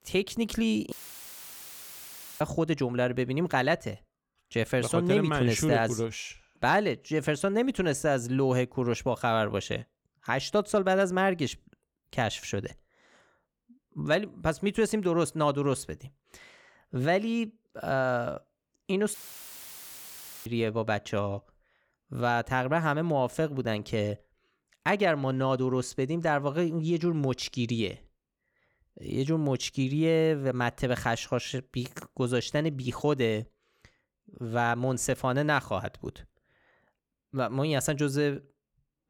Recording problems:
audio cutting out; filled with static; at 1 s for 1.5 s and at 19 s for 1.5 s

